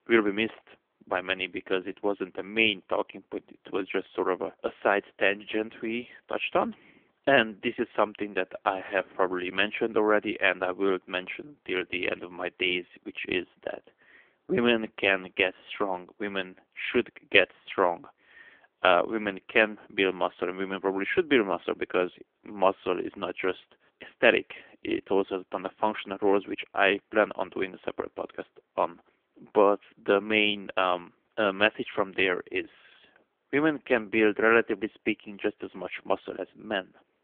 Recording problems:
phone-call audio; poor line; nothing above 3.5 kHz

